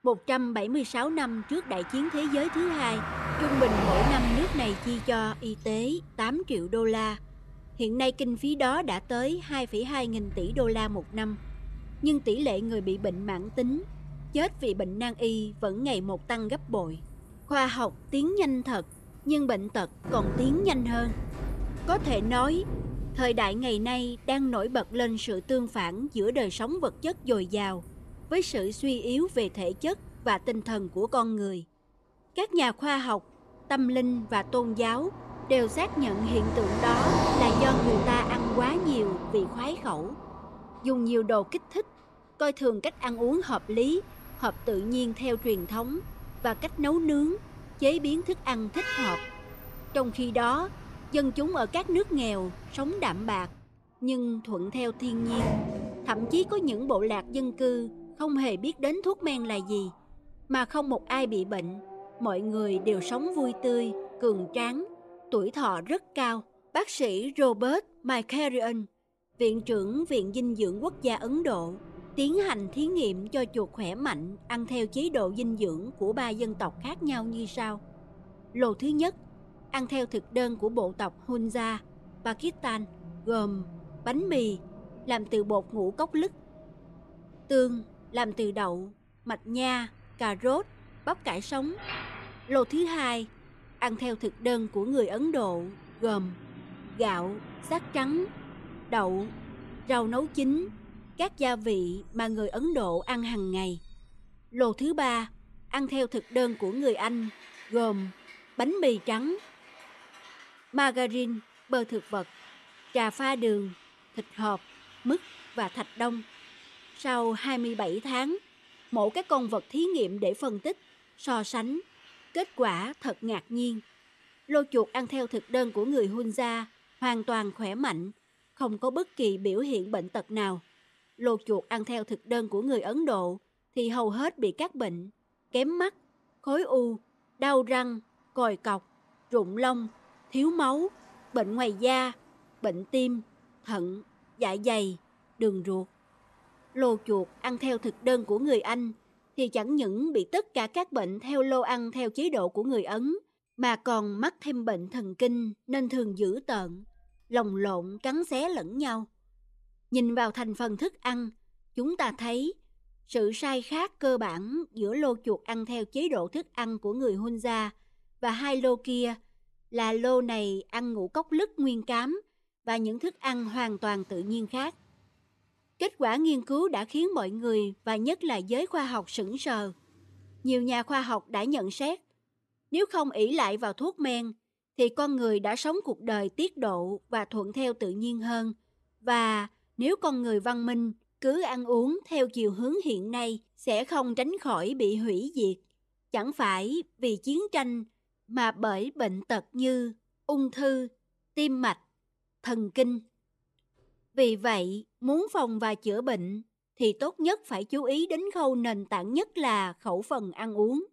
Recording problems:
traffic noise; loud; throughout; 9 dB below the speech

